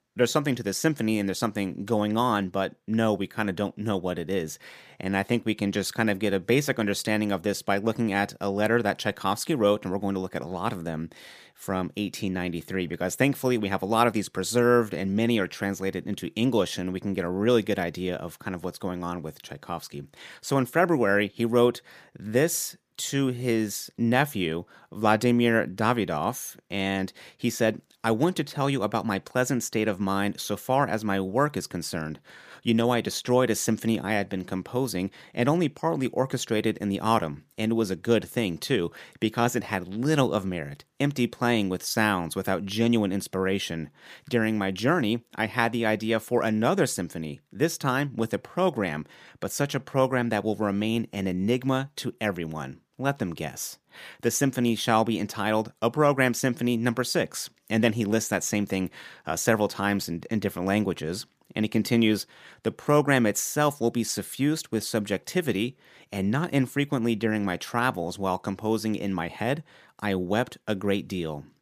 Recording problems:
none

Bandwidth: 15 kHz